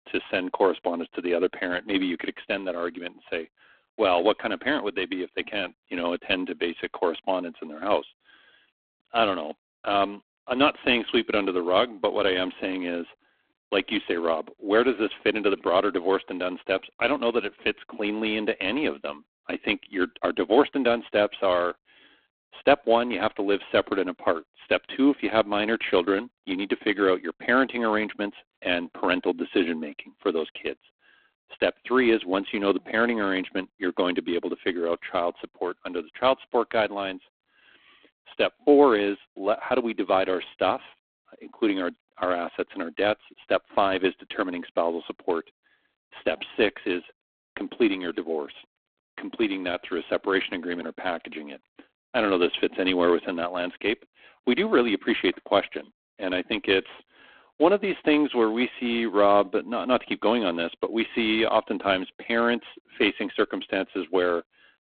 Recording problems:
phone-call audio; poor line

